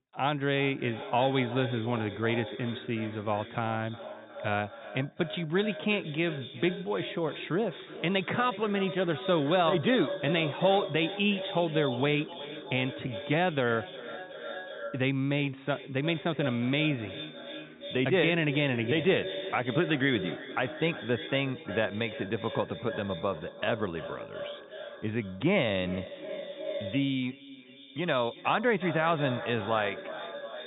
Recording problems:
echo of what is said; strong; throughout; 360 ms later, 10 dB below the speech
high frequencies cut off; severe; nothing above 4 kHz

